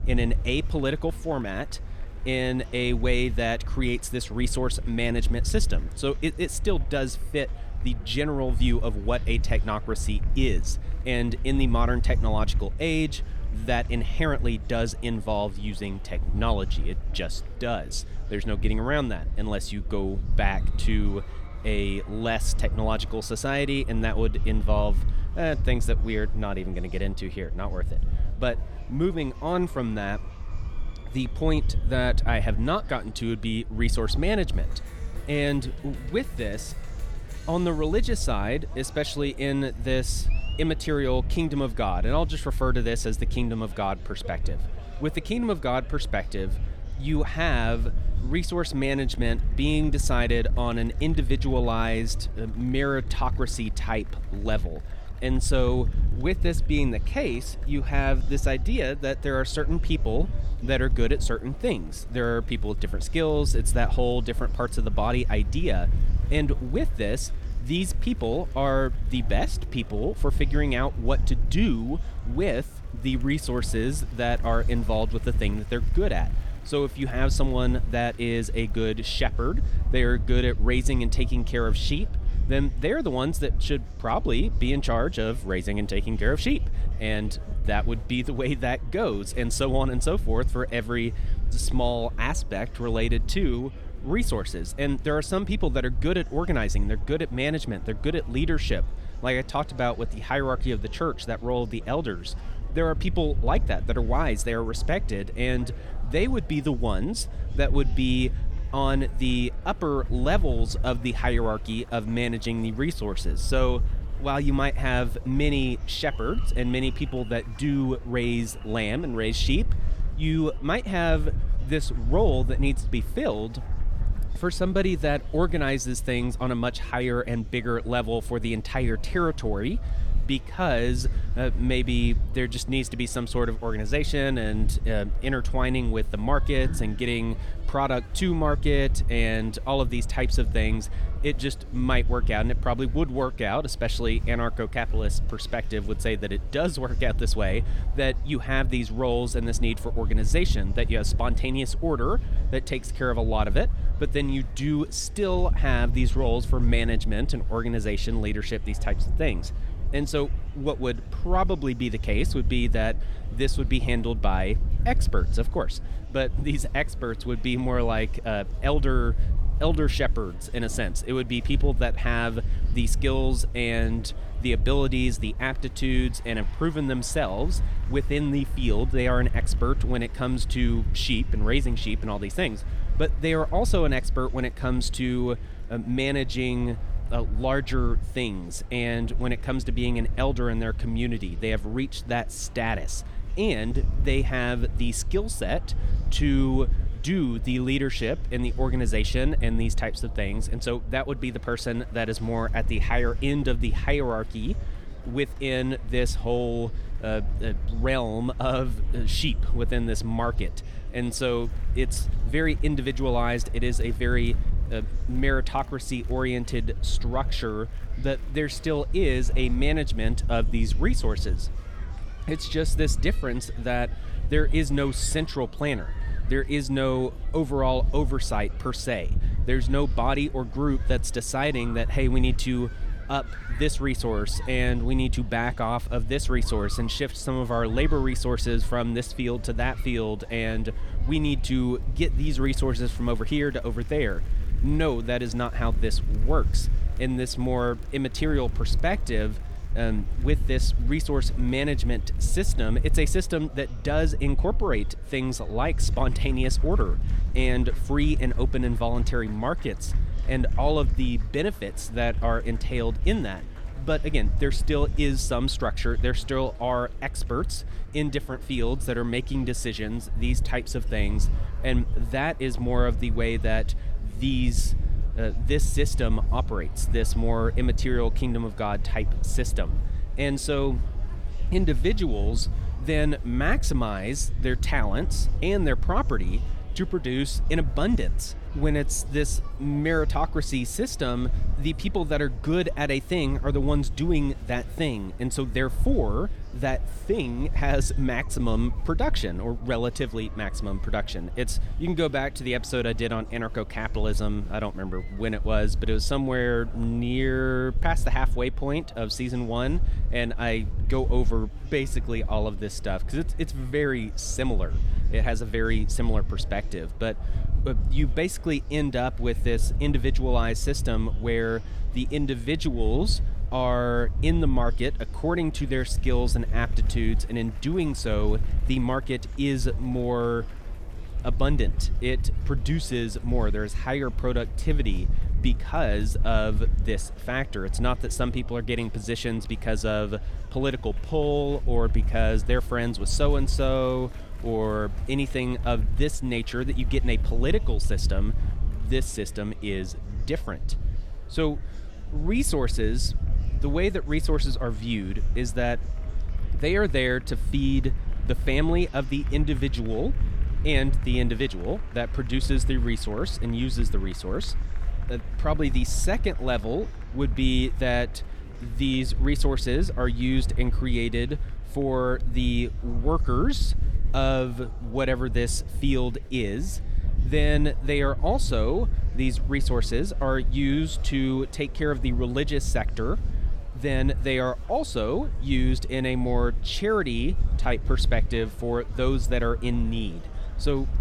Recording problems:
wind noise on the microphone; occasional gusts; 20 dB below the speech
murmuring crowd; faint; throughout; 20 dB below the speech

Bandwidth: 18 kHz